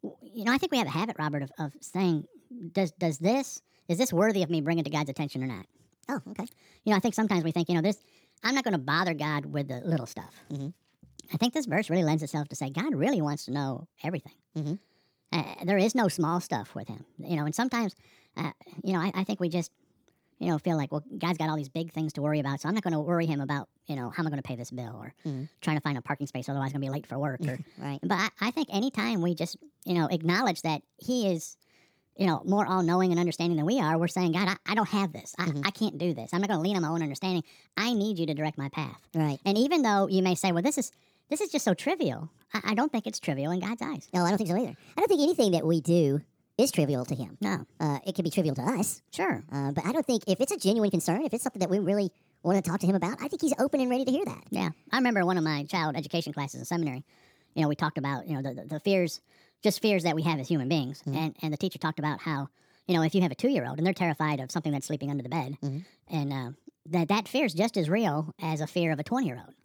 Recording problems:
wrong speed and pitch; too fast and too high; 1.5 times normal speed

